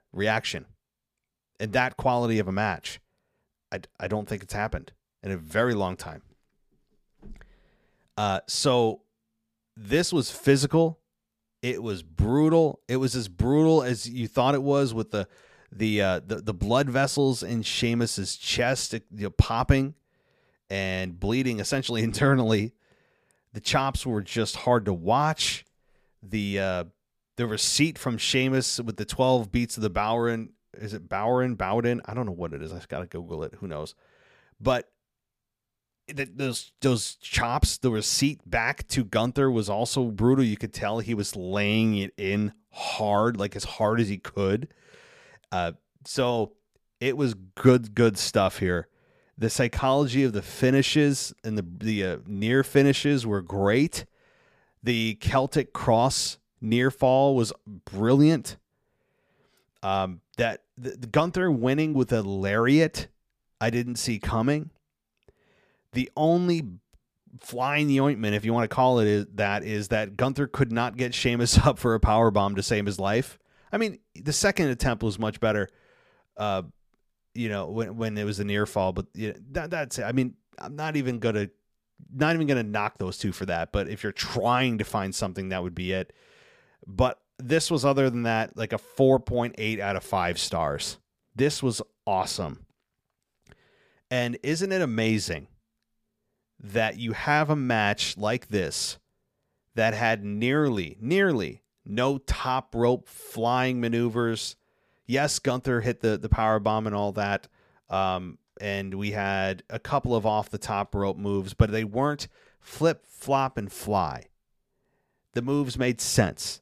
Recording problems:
none

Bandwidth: 15 kHz